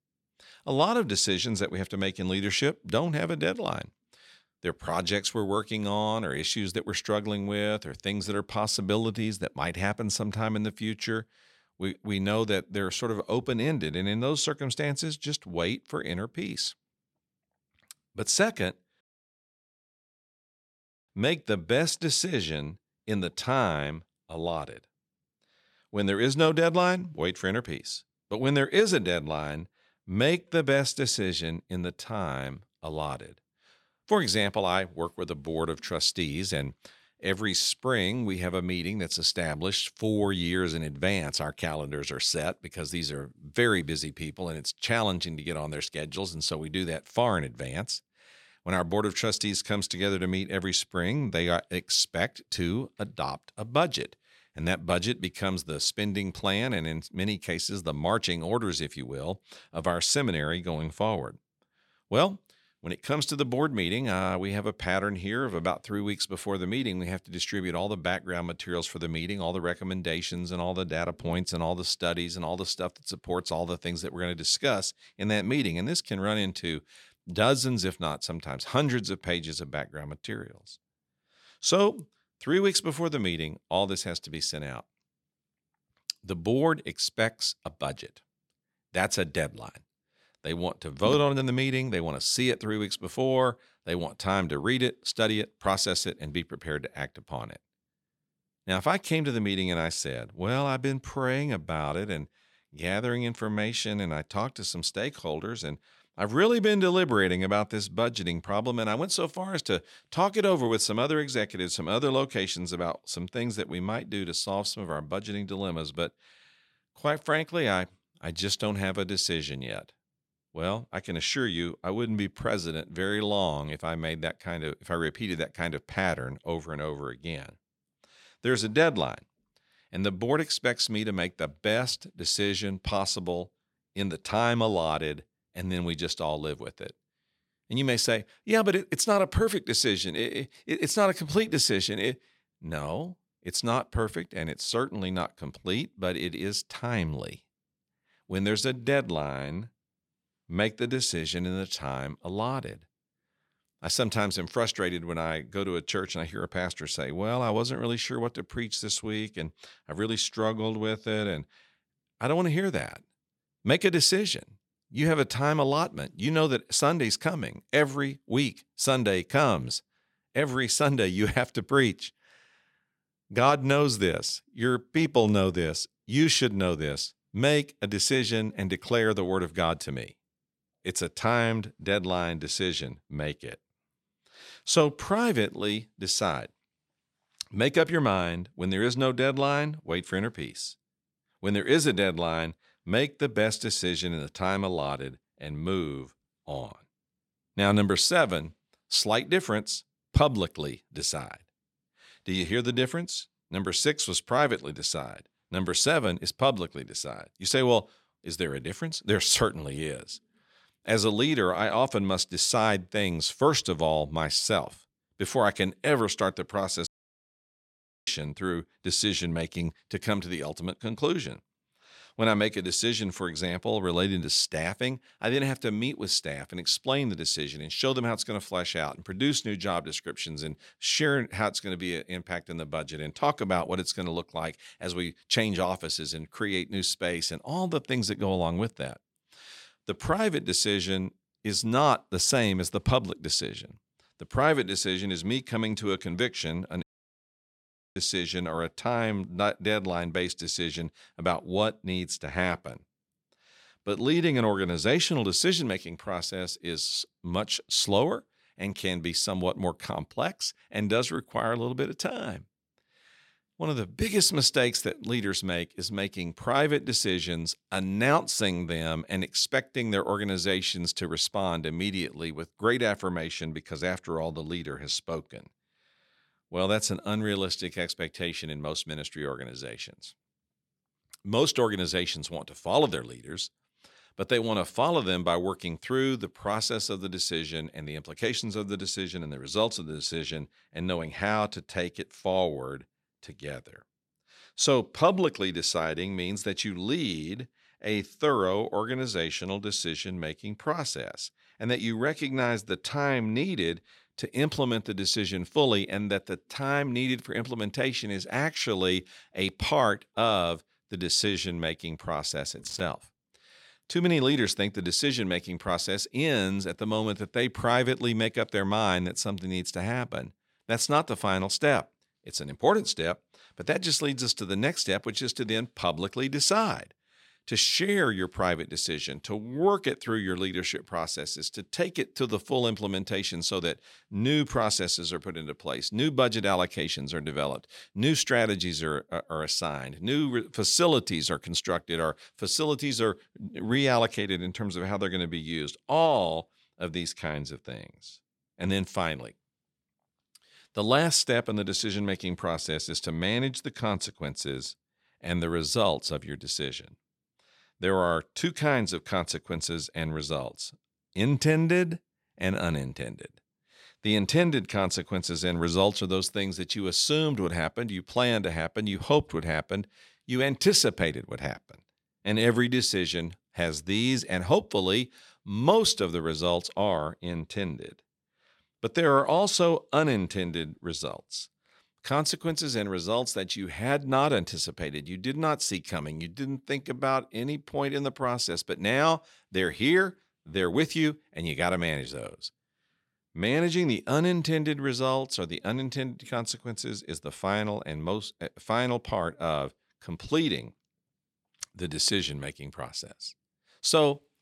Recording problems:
audio cutting out; at 19 s for 2 s, at 3:37 for 1 s and at 4:07 for 1 s

